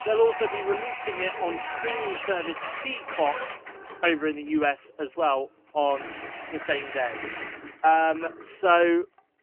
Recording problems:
phone-call audio; poor line; nothing above 3 kHz
household noises; loud; throughout; 8 dB below the speech

